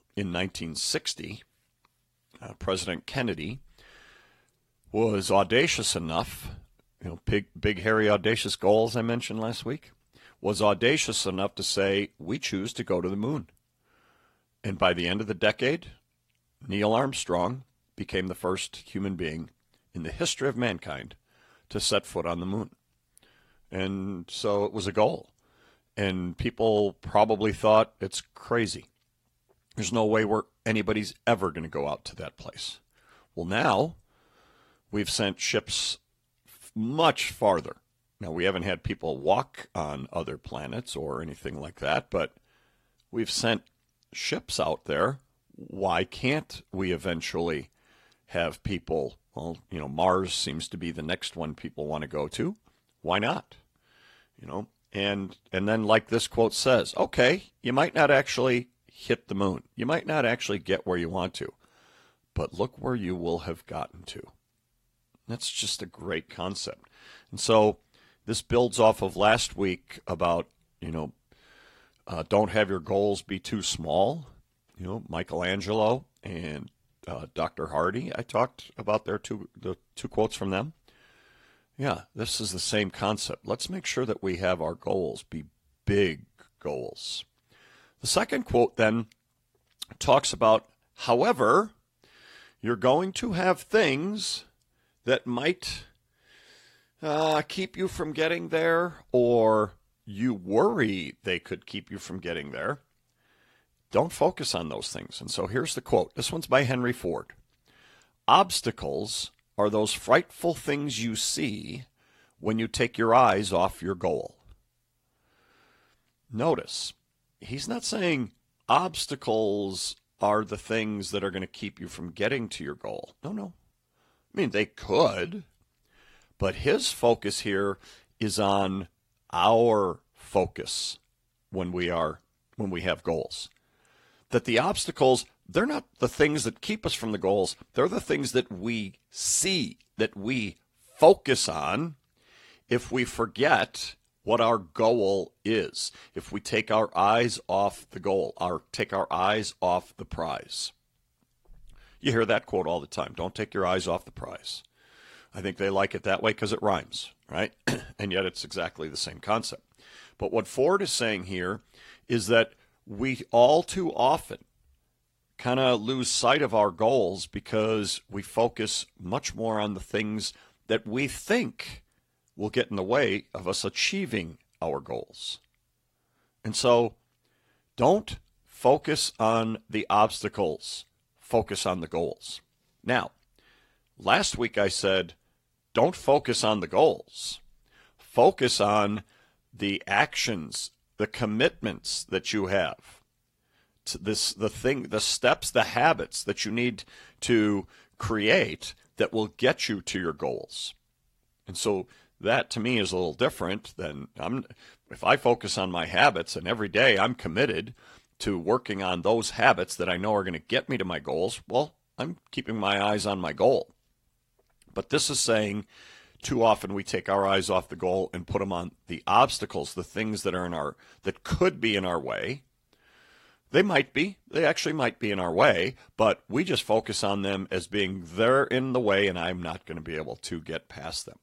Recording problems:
garbled, watery; slightly

